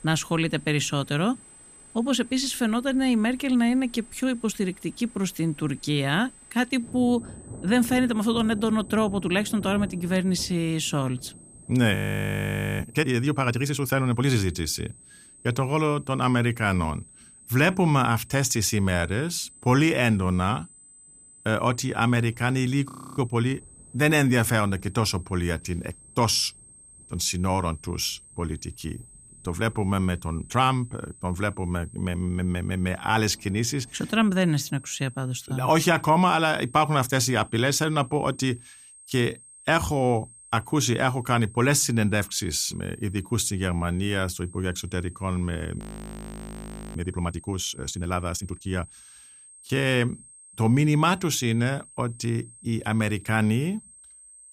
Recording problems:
high-pitched whine; faint; throughout; 8.5 kHz, 25 dB below the speech
rain or running water; faint; until 35 s; 20 dB below the speech
audio freezing; at 12 s for 1 s, at 23 s and at 46 s for 1 s

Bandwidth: 15 kHz